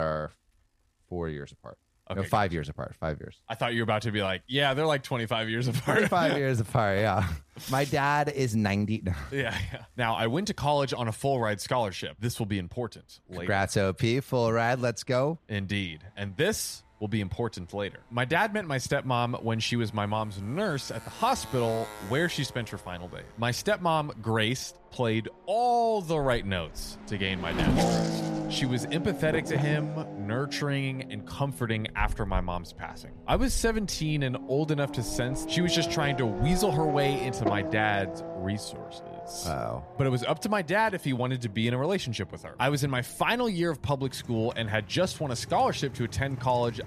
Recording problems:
traffic noise; loud; throughout; 7 dB below the speech
abrupt cut into speech; at the start

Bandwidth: 14.5 kHz